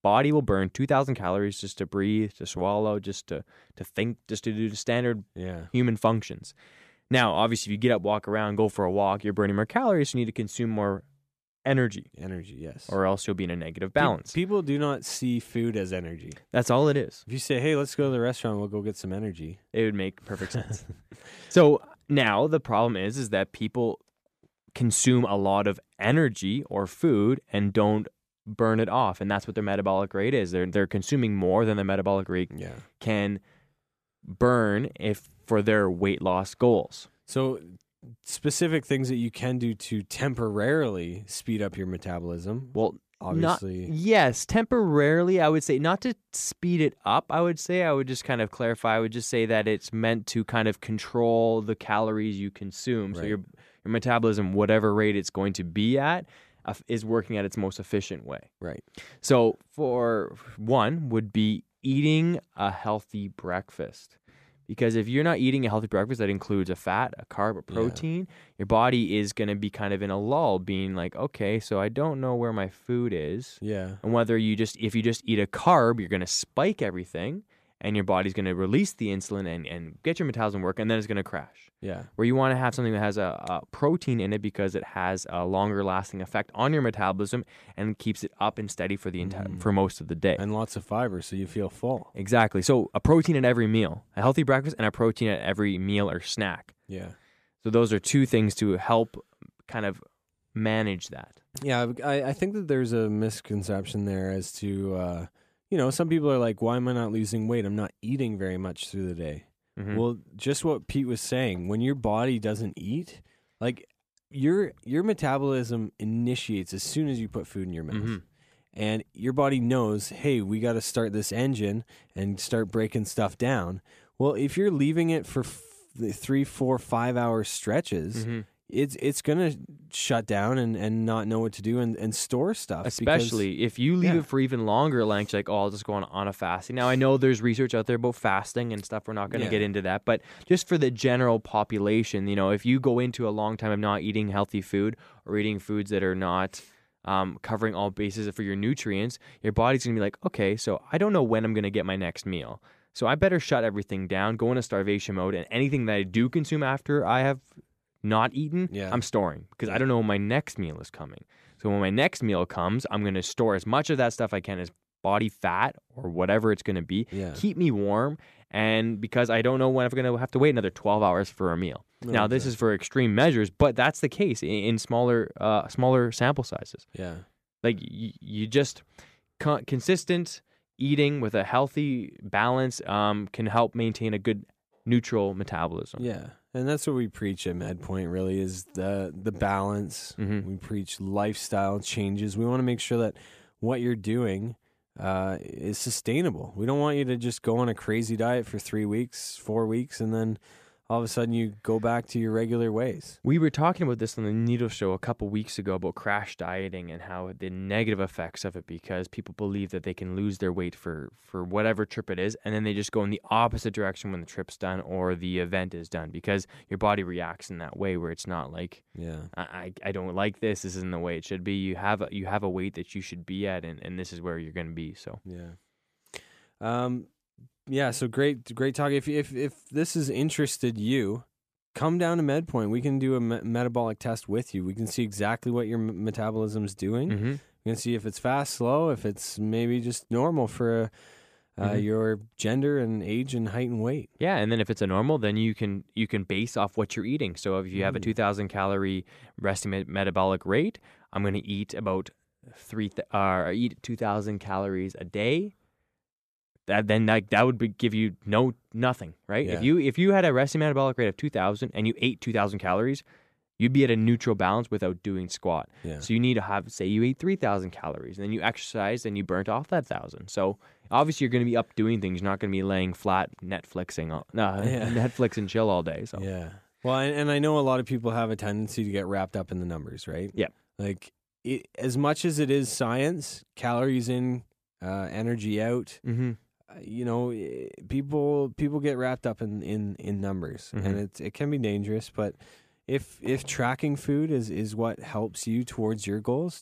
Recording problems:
none

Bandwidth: 14.5 kHz